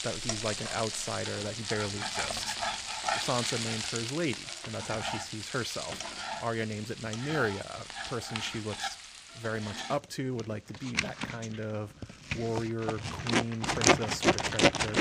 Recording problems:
household noises; very loud; throughout; 3 dB above the speech

